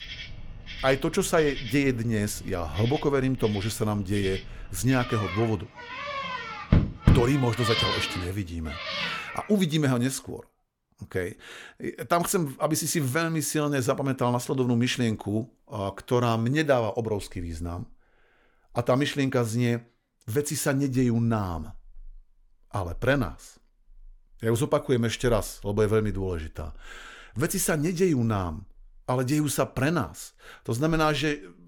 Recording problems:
animal sounds; loud; until 9.5 s; 4 dB below the speech

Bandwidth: 18 kHz